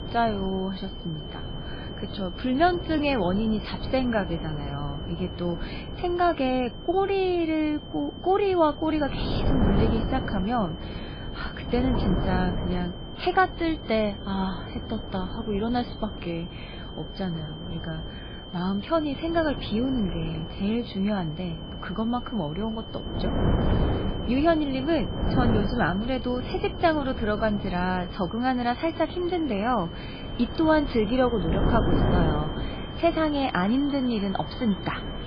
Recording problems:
garbled, watery; badly; nothing above 4.5 kHz
high-pitched whine; noticeable; throughout; 3 kHz, 15 dB below the speech
traffic noise; noticeable; from 28 s on; 15 dB below the speech
wind noise on the microphone; occasional gusts; 10 dB below the speech

